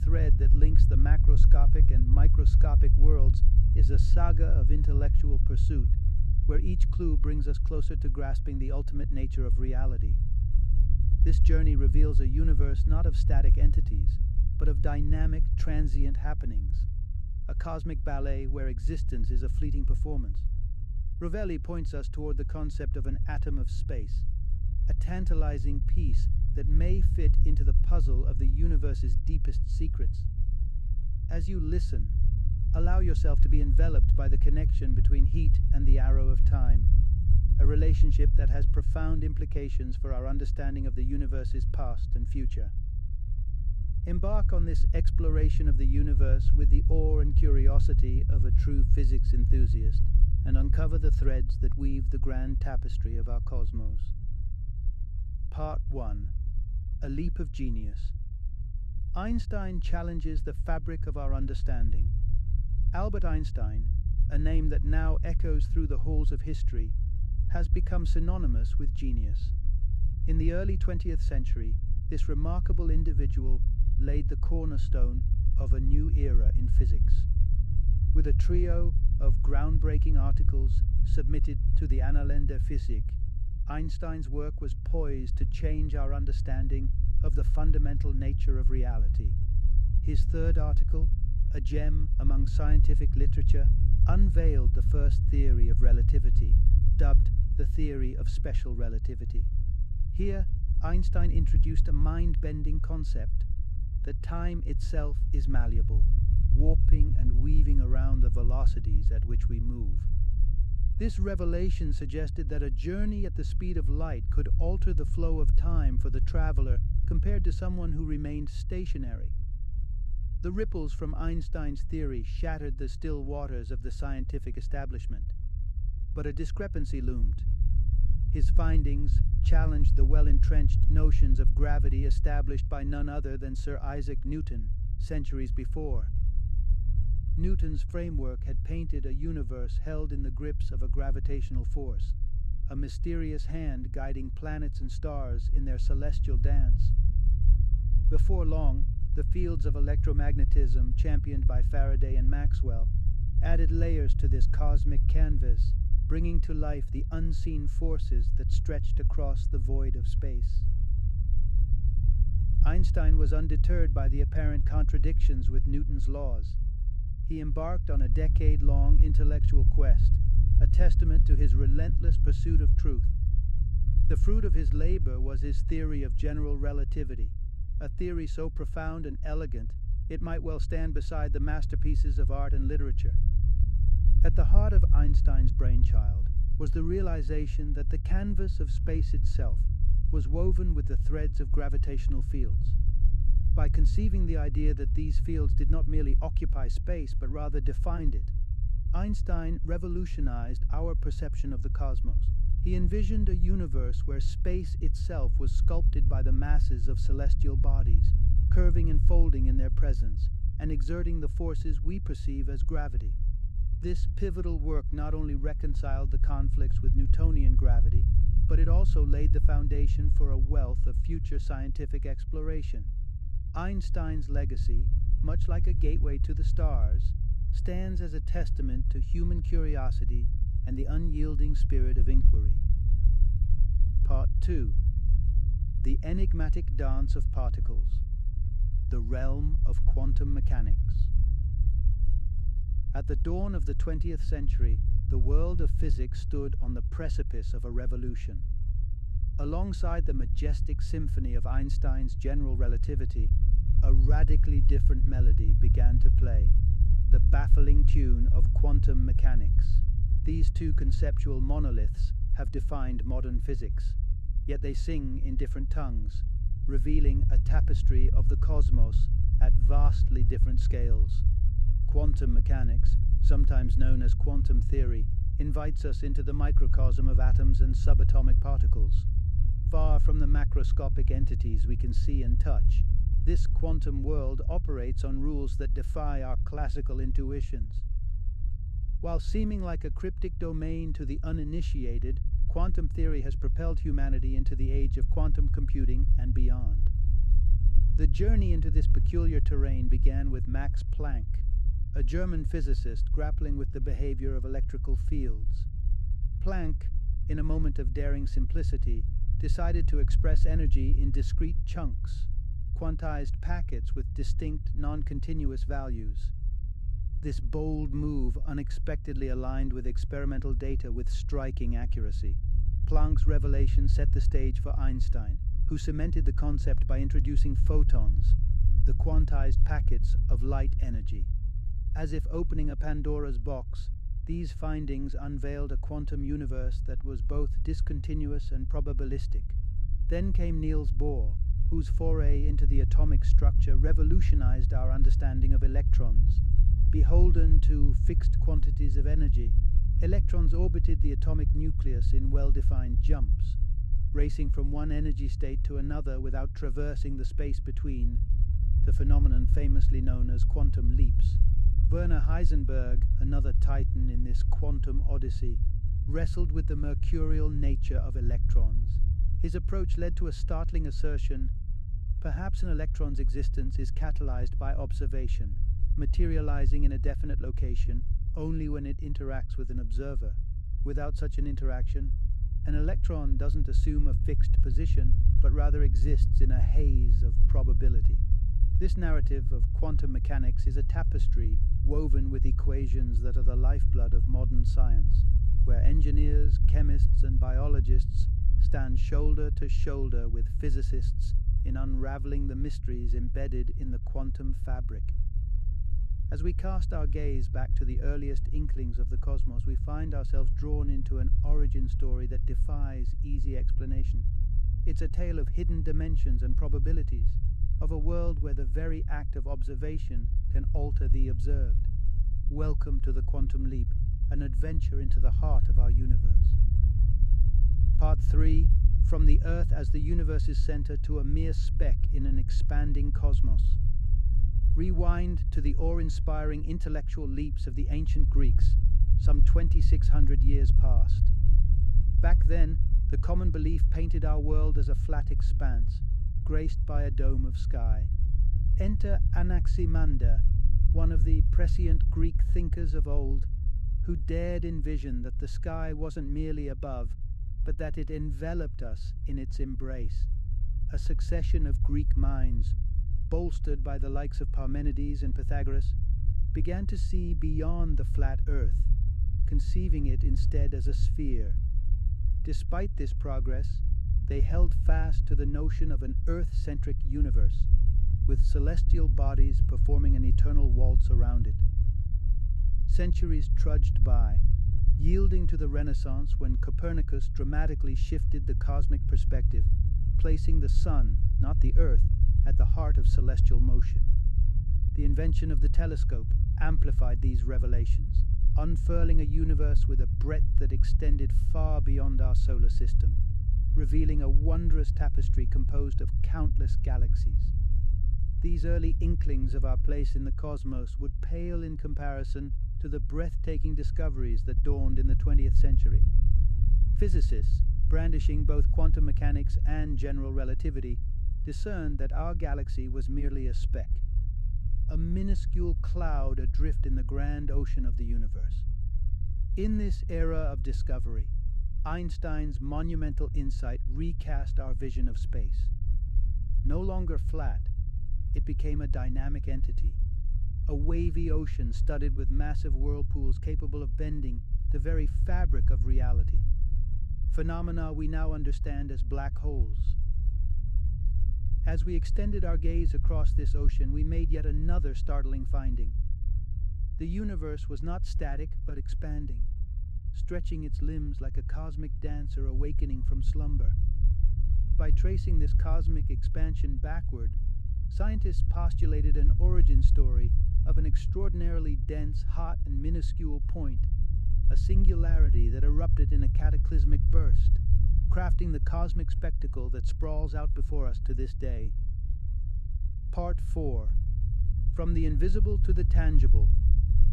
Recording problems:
low rumble; loud; throughout; 7 dB below the speech

